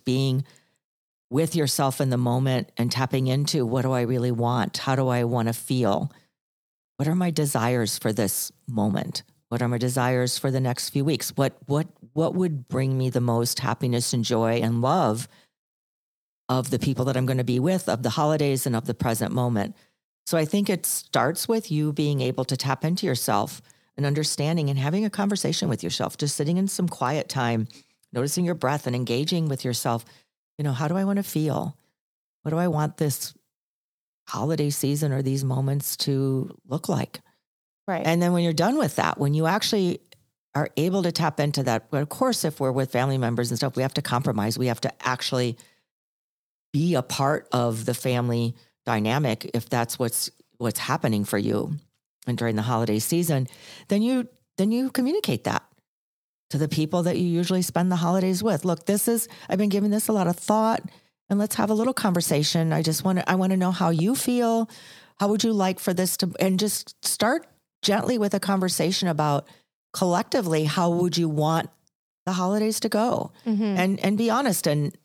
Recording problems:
none

